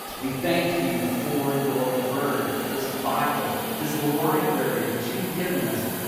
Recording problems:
room echo; strong; dies away in 2.2 s
off-mic speech; far
hiss; very faint; throughout; 5 dB below the speech

